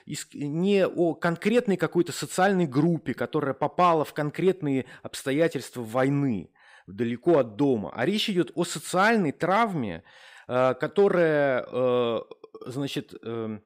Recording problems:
none

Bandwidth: 15.5 kHz